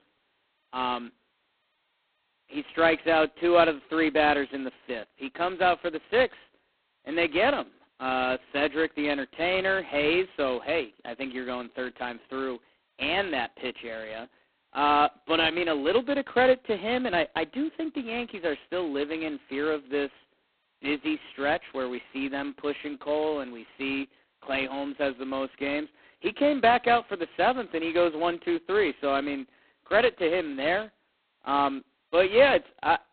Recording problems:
phone-call audio; poor line; nothing above 4 kHz

